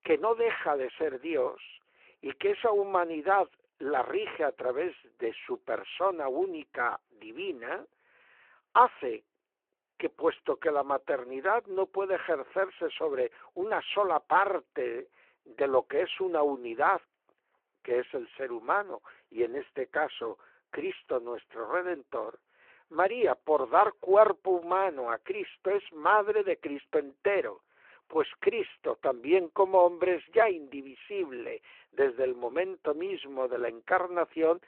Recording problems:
phone-call audio

